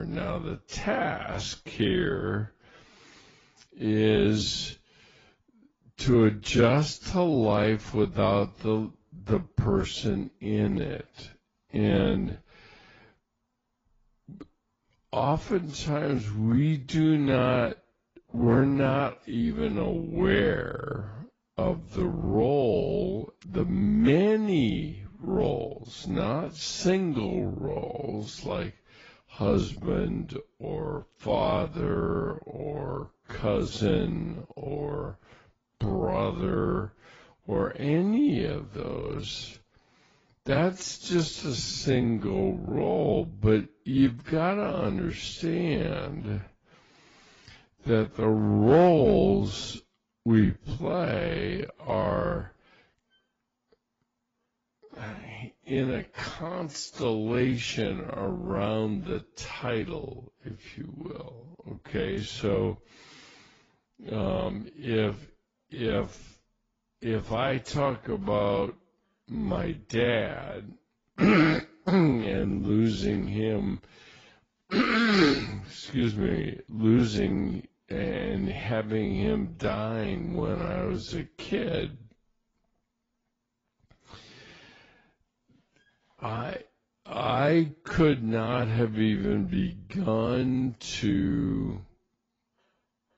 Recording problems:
garbled, watery; badly; nothing above 7.5 kHz
wrong speed, natural pitch; too slow; 0.6 times normal speed
abrupt cut into speech; at the start

